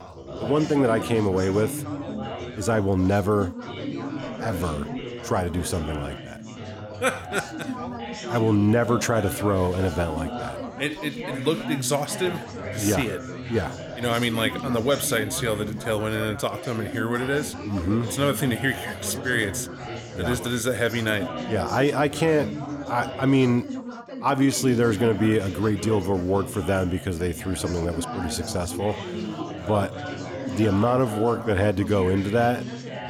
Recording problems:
background chatter; loud; throughout; 4 voices, 9 dB below the speech

